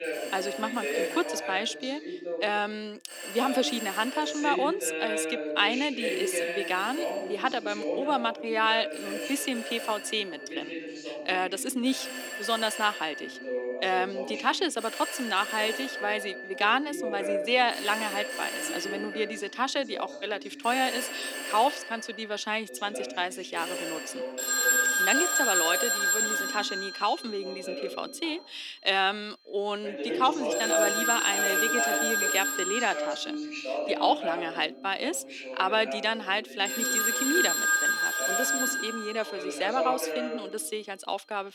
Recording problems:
thin; somewhat; fading below 300 Hz
alarms or sirens; very loud; throughout; 1 dB above the speech
voice in the background; loud; throughout; 6 dB below the speech

